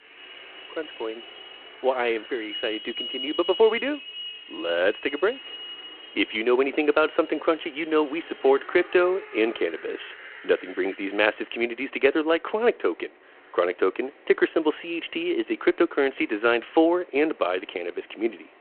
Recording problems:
phone-call audio
traffic noise; noticeable; throughout; 15 dB below the speech

